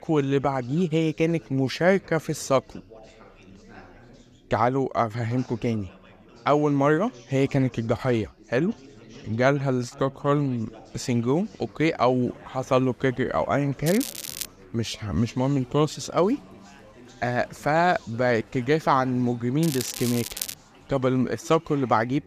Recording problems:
crackling; loud; at 14 s and at 20 s; 8 dB below the speech
chatter from many people; faint; throughout; 25 dB below the speech

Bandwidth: 14.5 kHz